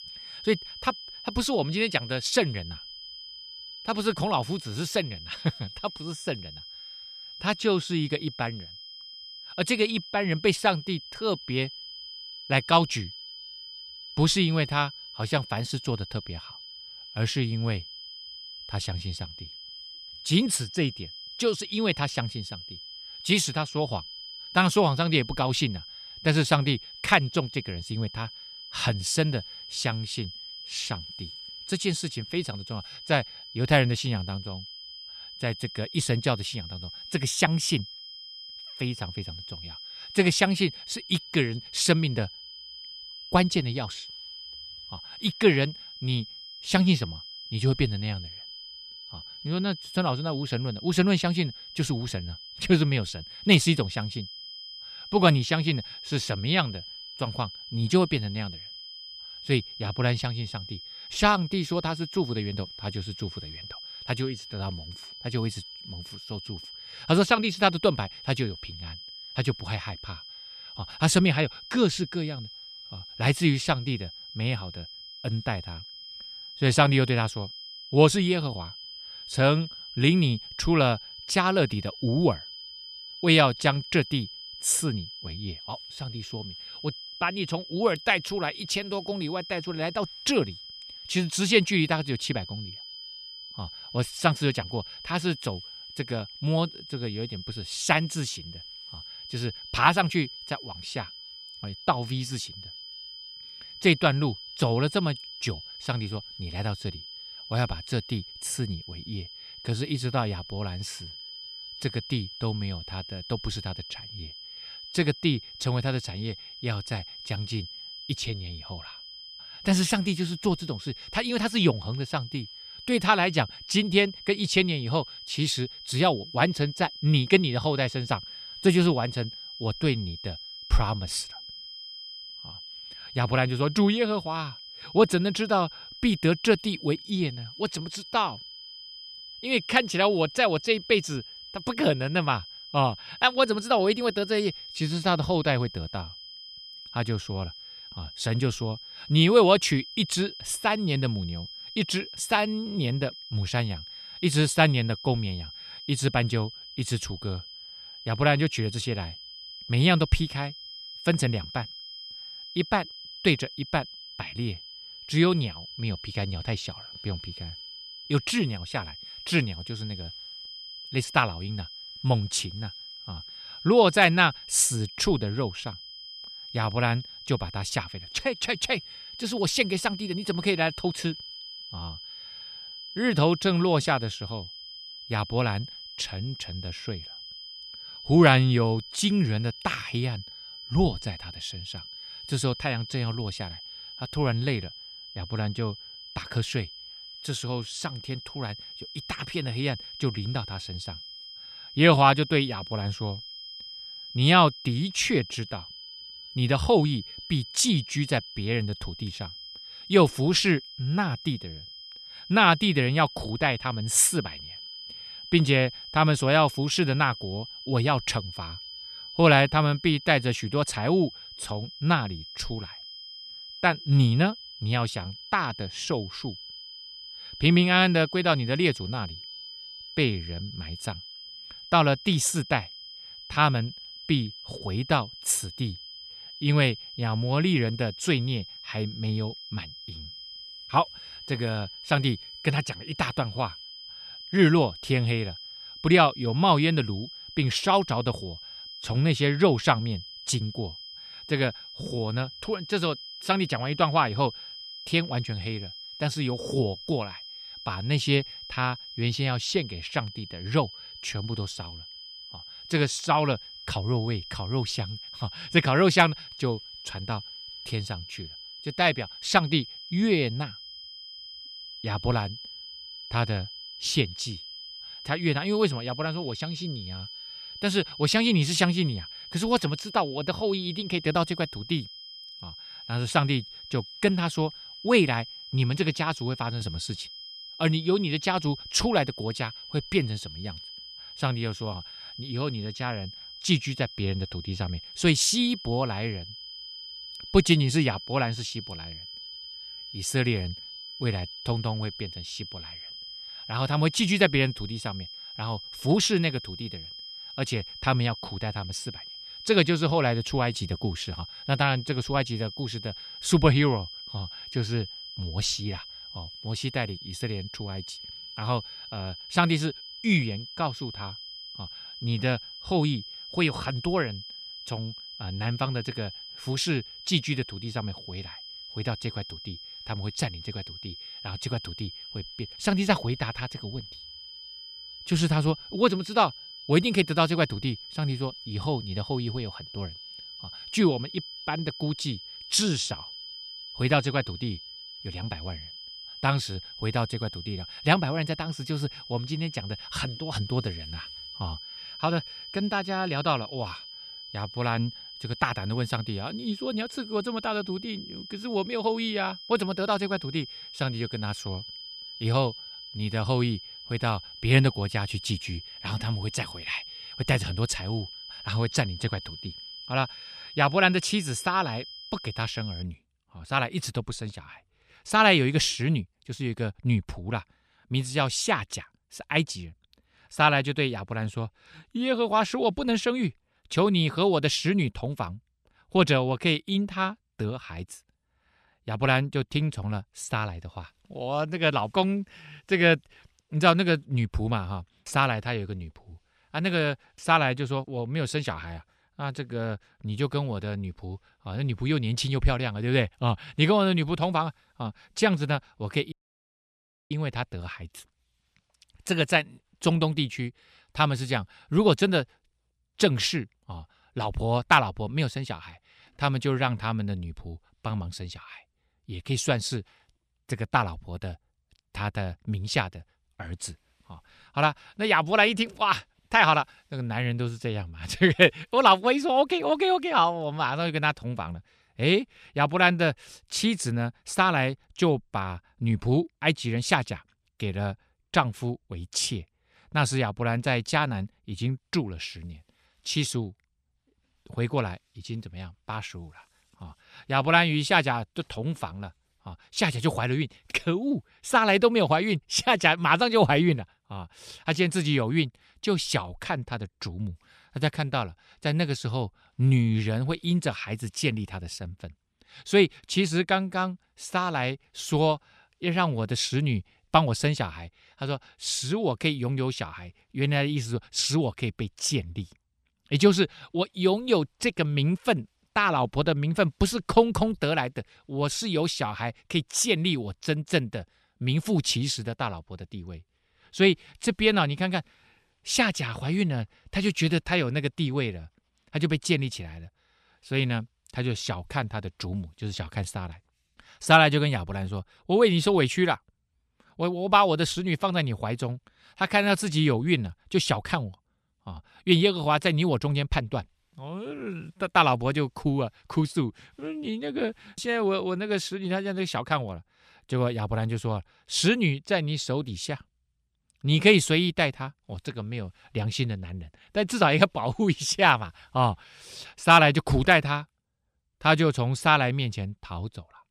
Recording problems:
high-pitched whine; noticeable; until 6:13; 5 kHz, 15 dB below the speech
audio cutting out; at 6:46 for 1 s

